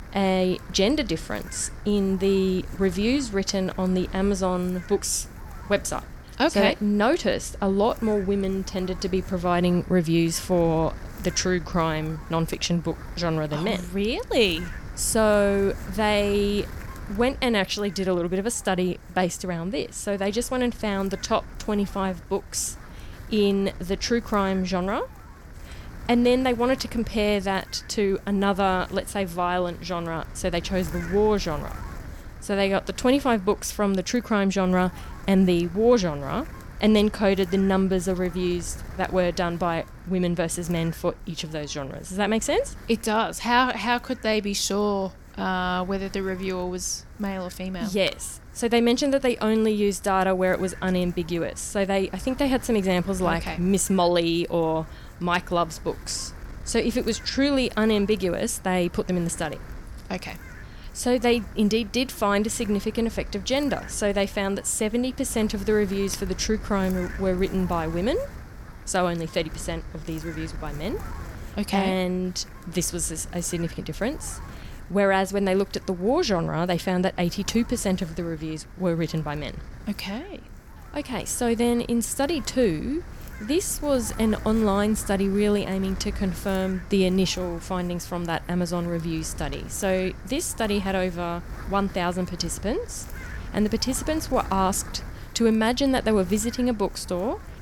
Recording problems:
wind noise on the microphone; occasional gusts; 20 dB below the speech

